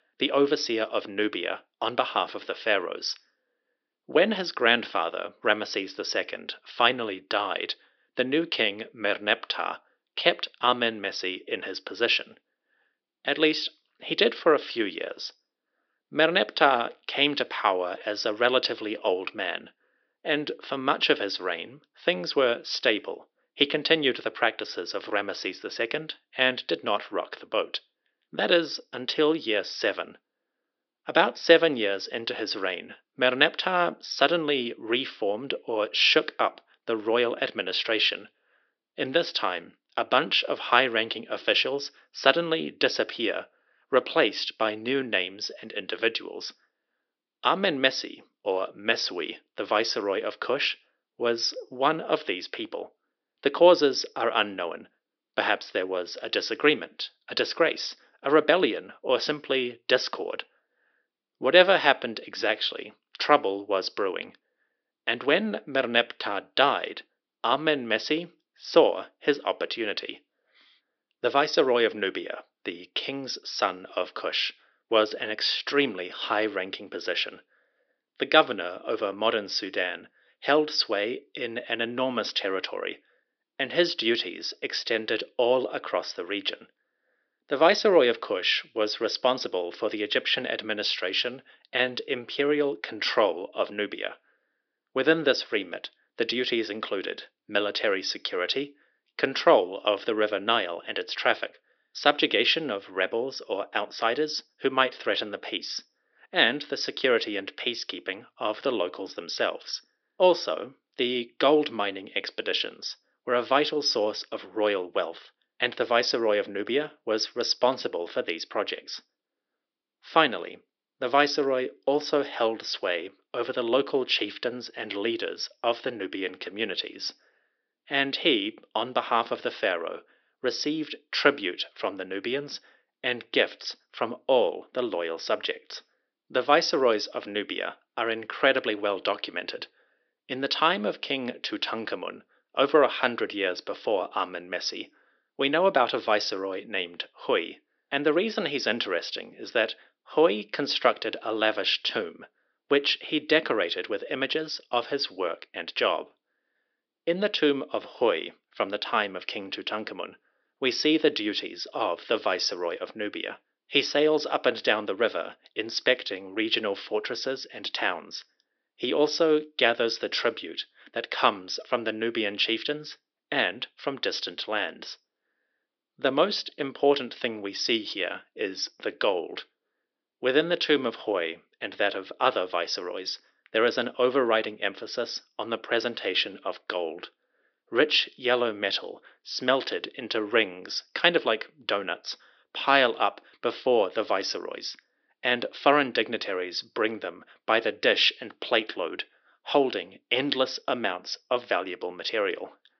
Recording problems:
thin; somewhat; fading below 300 Hz
high frequencies cut off; noticeable; nothing above 5.5 kHz

